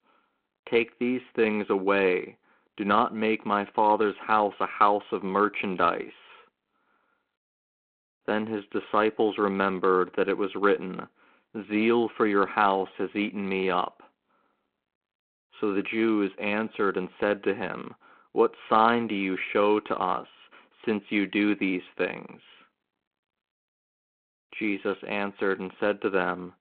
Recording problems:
phone-call audio

